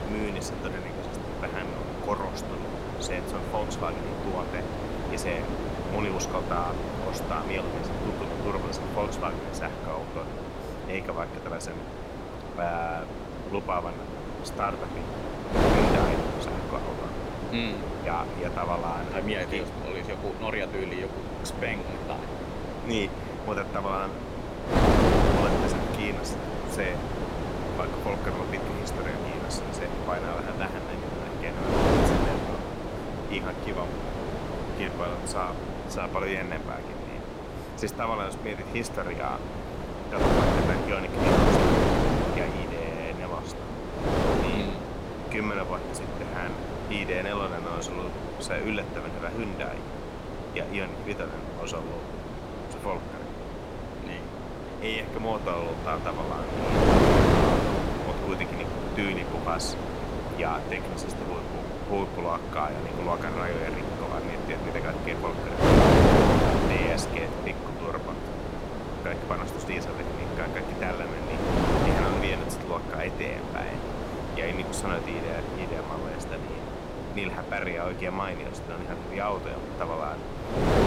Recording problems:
wind noise on the microphone; heavy; 2 dB above the speech

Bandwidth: 16 kHz